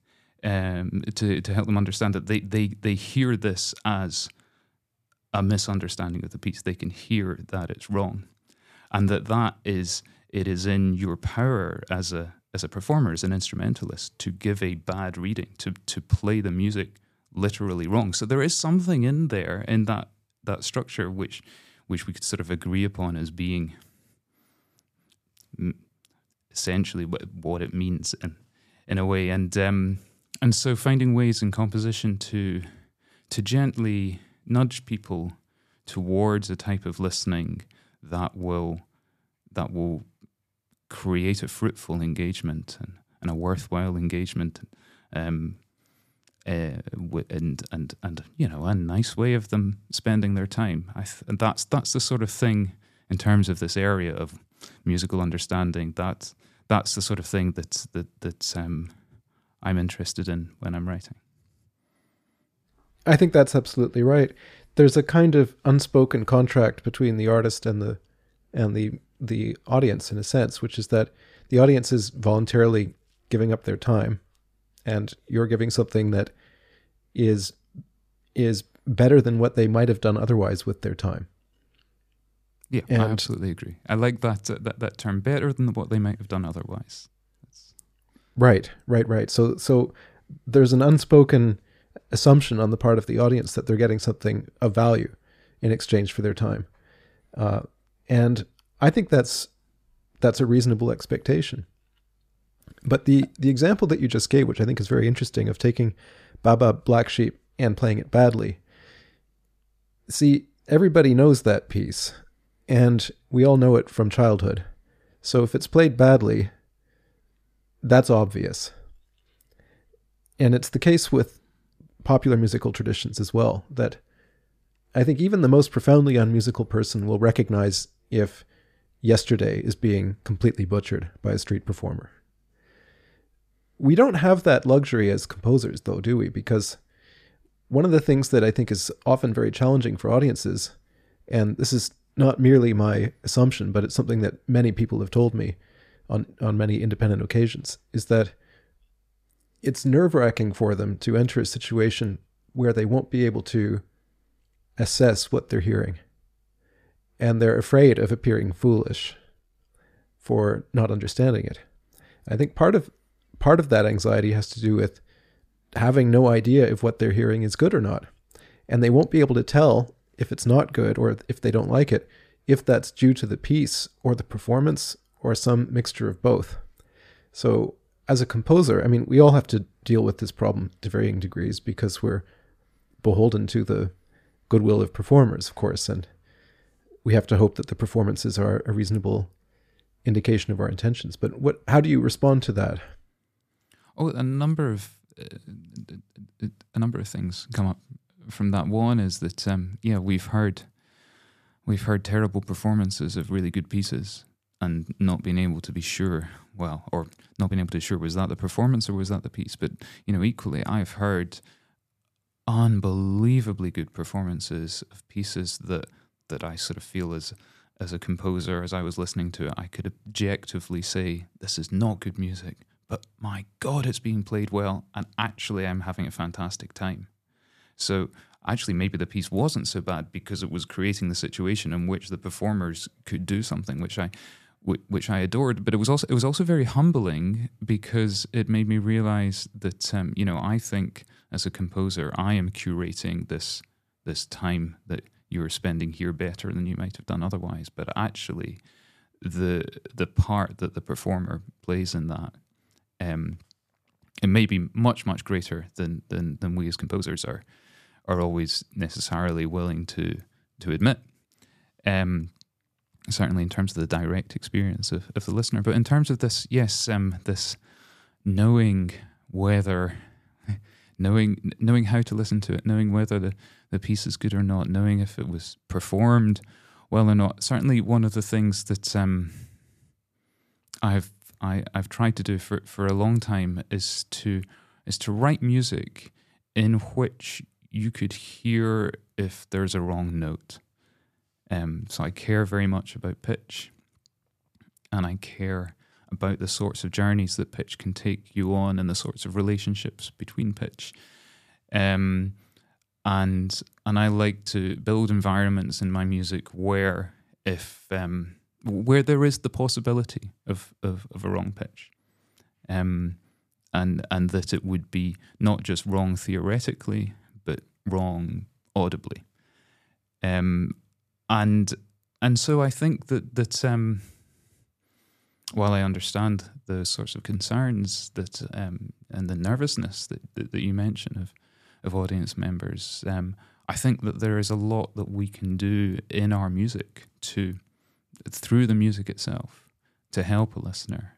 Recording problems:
uneven, jittery; strongly; from 1:28 to 5:05

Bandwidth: 14.5 kHz